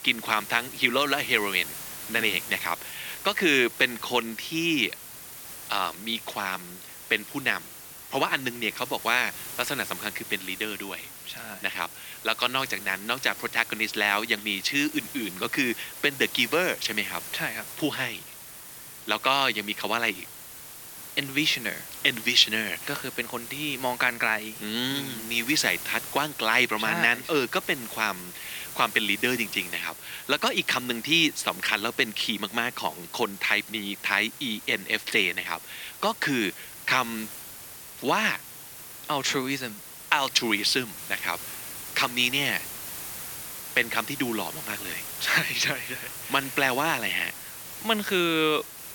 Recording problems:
thin; somewhat; fading below 350 Hz
hiss; noticeable; throughout; 10 dB below the speech

